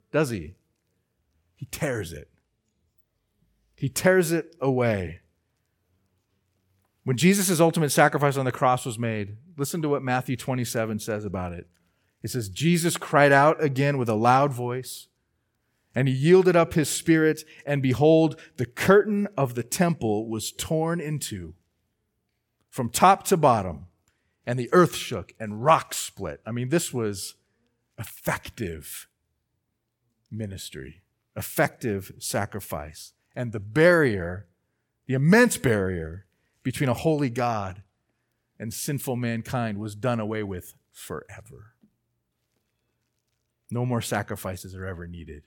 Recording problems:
none

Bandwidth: 17.5 kHz